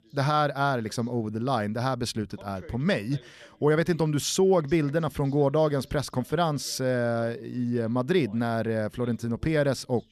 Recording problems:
voice in the background; faint; throughout; 25 dB below the speech

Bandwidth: 13.5 kHz